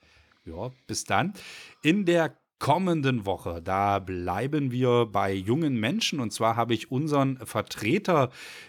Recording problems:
none

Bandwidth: 18.5 kHz